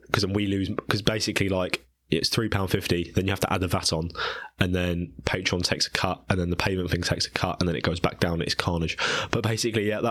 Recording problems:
squashed, flat; somewhat
abrupt cut into speech; at the end

